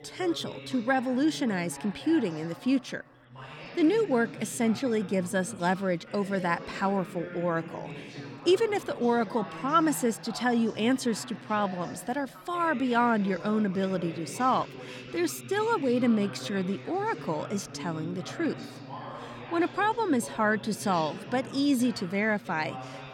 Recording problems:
background chatter; noticeable; throughout; 2 voices, 15 dB below the speech

